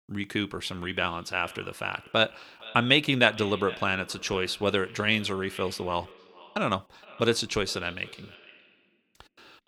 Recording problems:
echo of what is said; faint; throughout; 470 ms later, 20 dB below the speech

